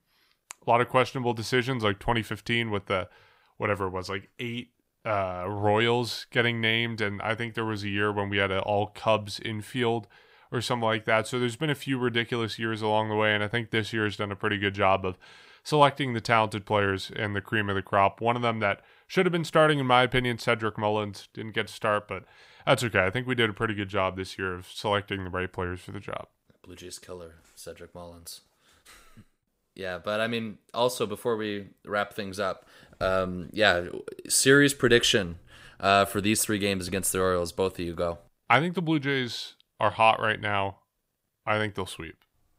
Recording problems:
none

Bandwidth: 15.5 kHz